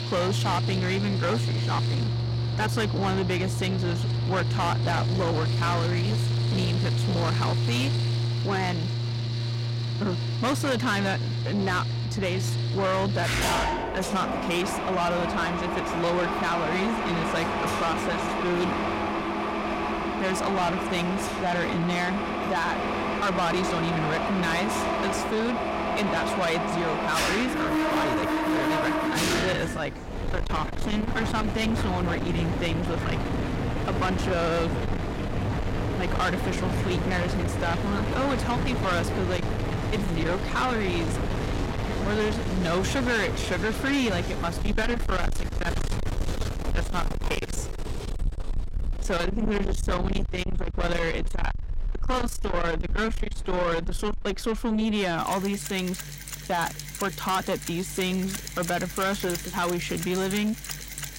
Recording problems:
distortion; heavy; 7 dB below the speech
machinery noise; loud; throughout; 1 dB below the speech

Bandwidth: 16 kHz